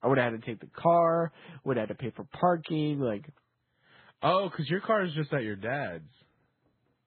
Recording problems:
garbled, watery; badly; nothing above 4 kHz
muffled; very slightly; fading above 4 kHz

